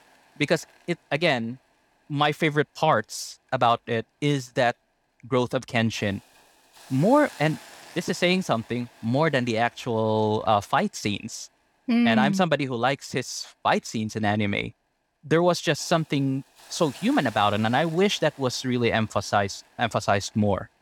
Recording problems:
hiss; faint; throughout; 25 dB below the speech

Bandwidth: 18.5 kHz